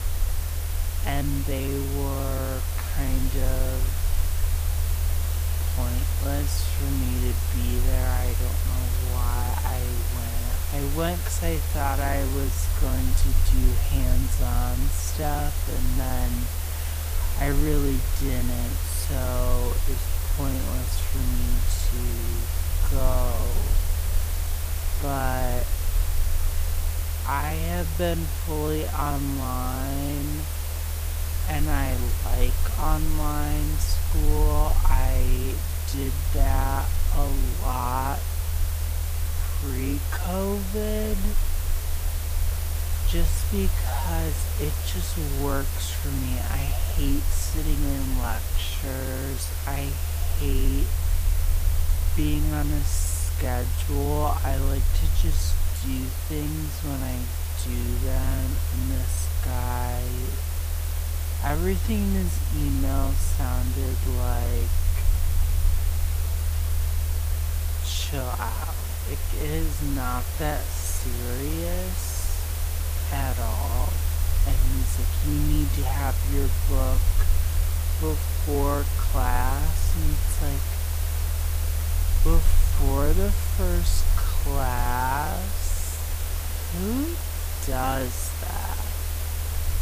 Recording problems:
wrong speed, natural pitch; too slow; 0.5 times normal speed
hiss; loud; throughout; 3 dB below the speech
low rumble; noticeable; throughout; 15 dB below the speech

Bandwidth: 15 kHz